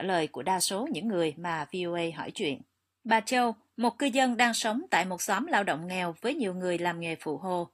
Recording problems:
garbled, watery; slightly; nothing above 15 kHz
abrupt cut into speech; at the start

